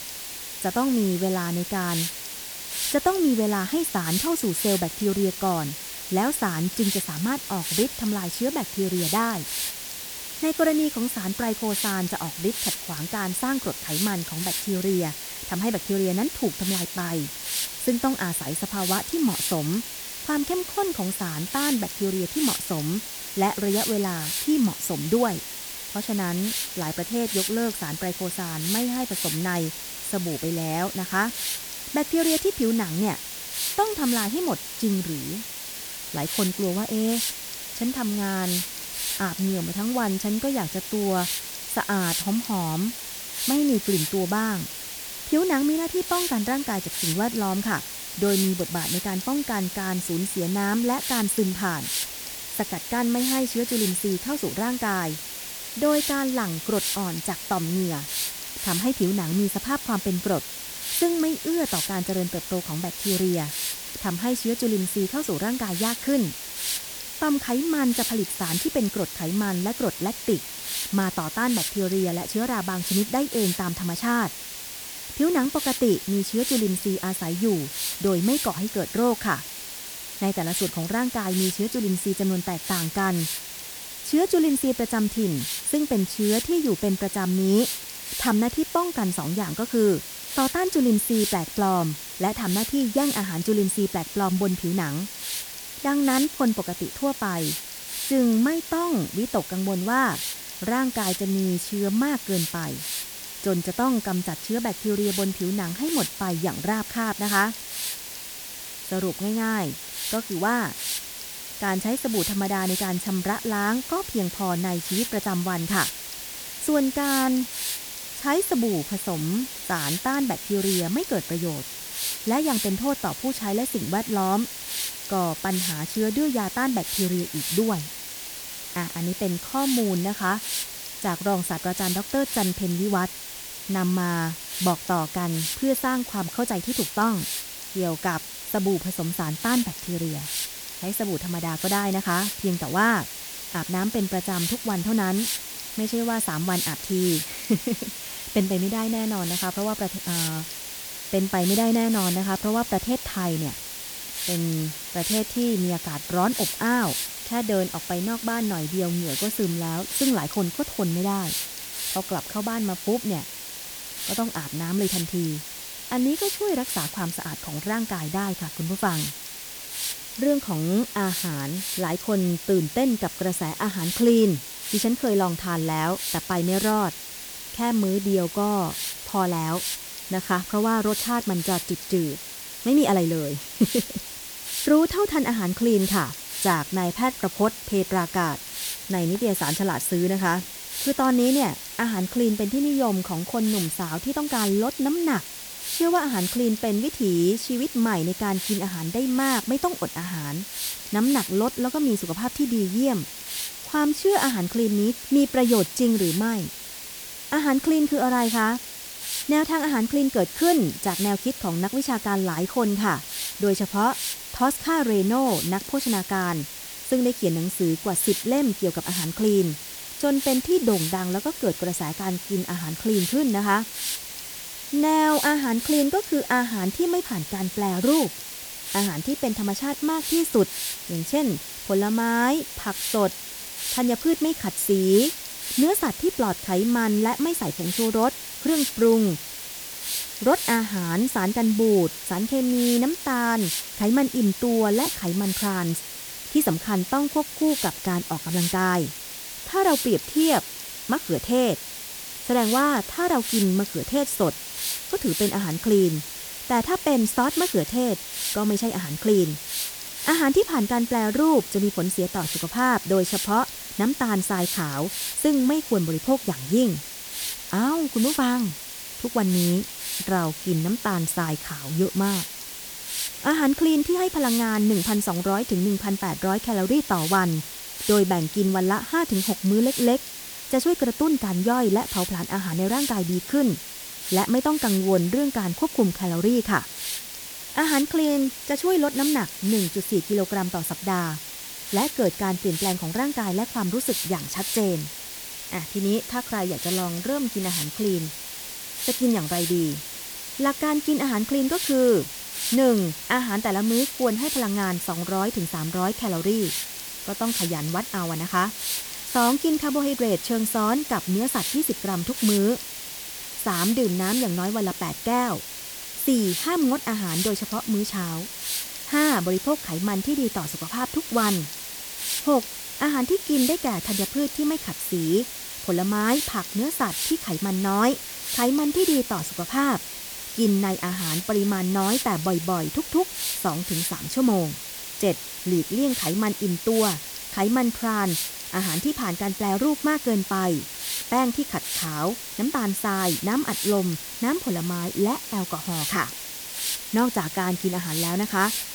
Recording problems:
hiss; loud; throughout; 6 dB below the speech

